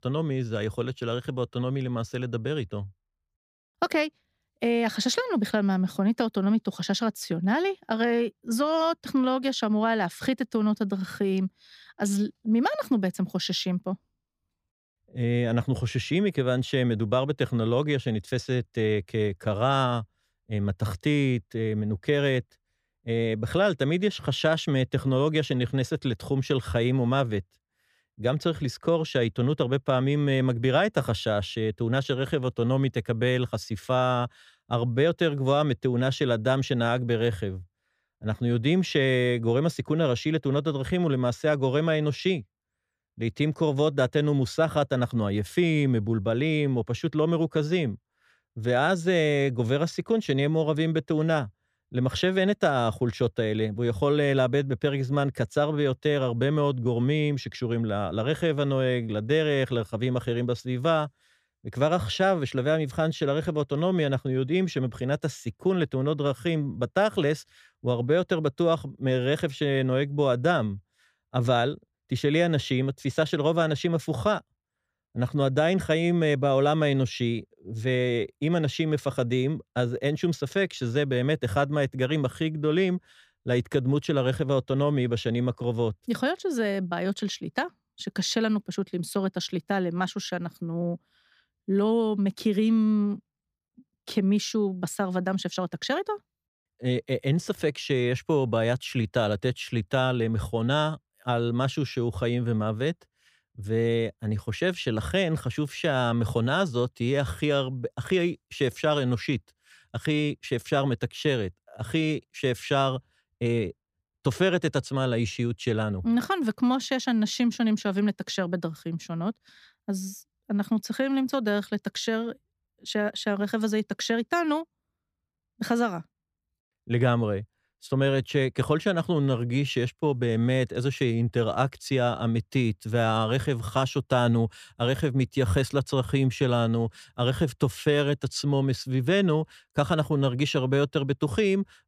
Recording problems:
none

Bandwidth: 15 kHz